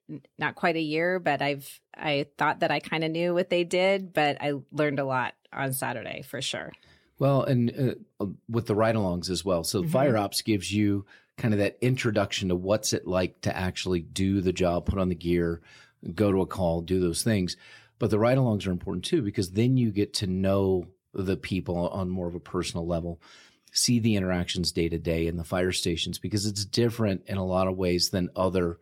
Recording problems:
none

